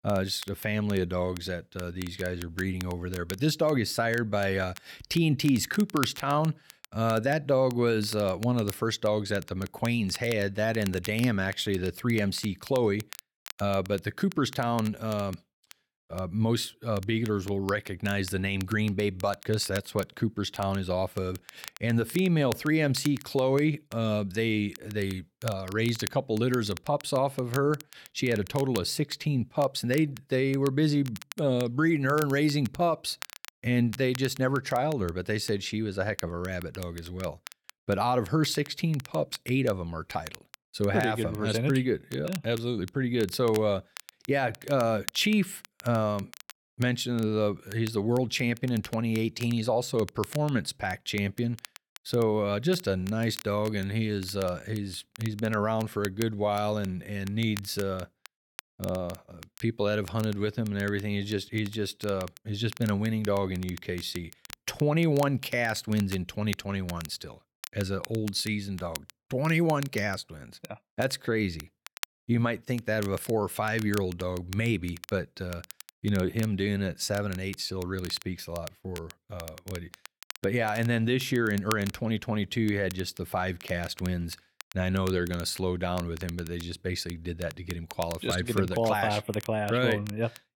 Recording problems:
crackle, like an old record; noticeable; 15 dB below the speech

